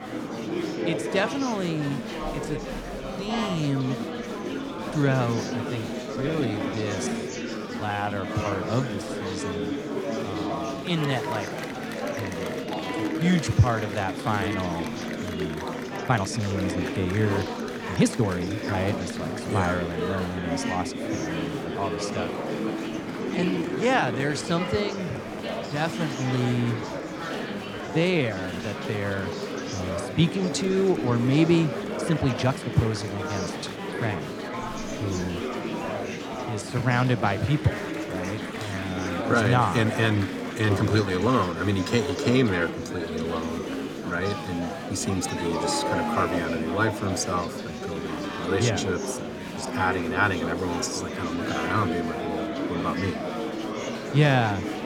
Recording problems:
murmuring crowd; loud; throughout; 4 dB below the speech
uneven, jittery; strongly; from 5 to 50 s

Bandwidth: 18.5 kHz